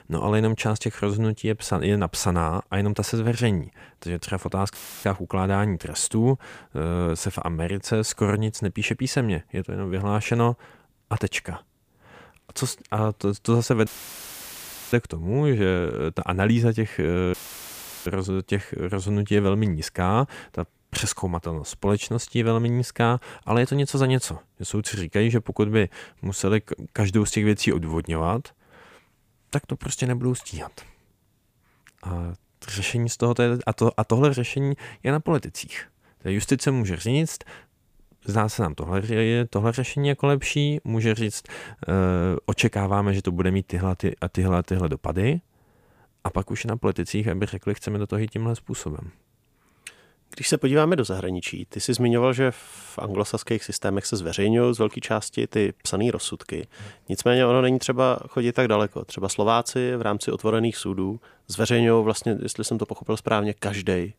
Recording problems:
audio cutting out; filled with static; at 5 s, at 14 s for 1 s and at 17 s for 0.5 s

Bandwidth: 15 kHz